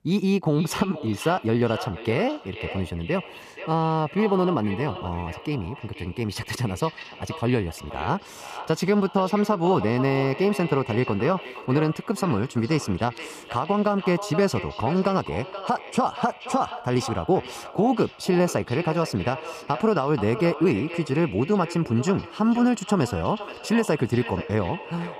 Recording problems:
wrong speed, natural pitch; too fast; 1.5 times normal speed
echo of what is said; noticeable; throughout; 480 ms later, 10 dB below the speech

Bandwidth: 14.5 kHz